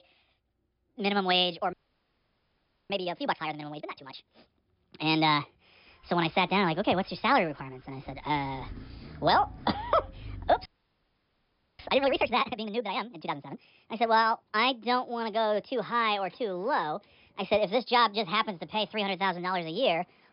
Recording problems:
wrong speed and pitch; too fast and too high; 1.5 times normal speed
high frequencies cut off; noticeable; nothing above 5.5 kHz
traffic noise; faint; throughout; 20 dB below the speech
audio freezing; at 1.5 s for 1 s and at 11 s for 1 s

